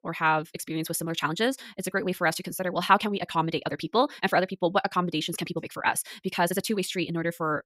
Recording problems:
wrong speed, natural pitch; too fast; 1.8 times normal speed

